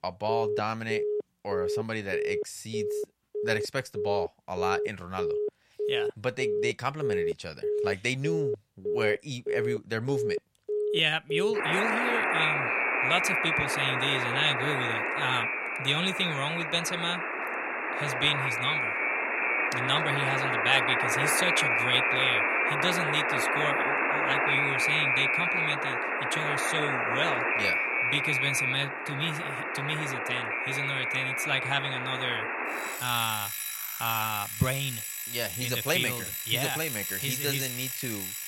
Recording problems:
alarms or sirens; very loud; throughout; 2 dB above the speech

